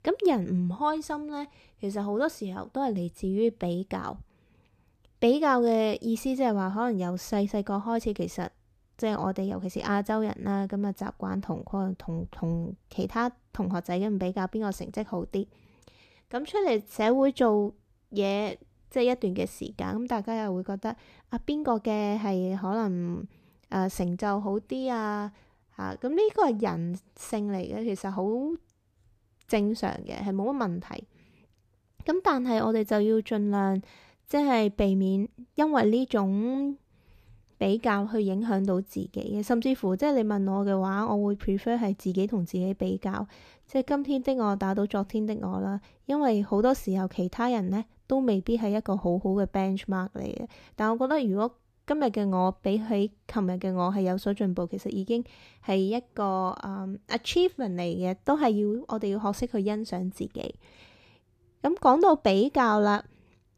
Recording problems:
uneven, jittery; strongly; from 16 to 45 s

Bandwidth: 14.5 kHz